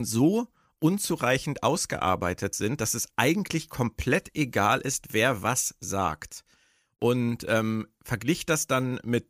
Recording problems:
abrupt cut into speech; at the start

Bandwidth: 15 kHz